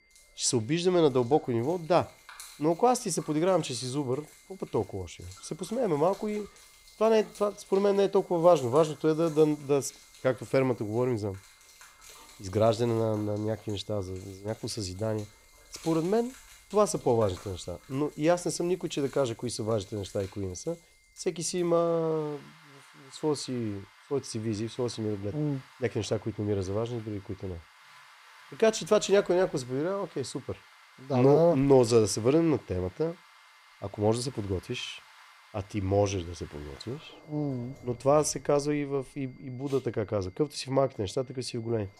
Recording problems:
high-pitched whine; faint; throughout; 2 kHz, 35 dB below the speech
rain or running water; faint; throughout; 25 dB below the speech

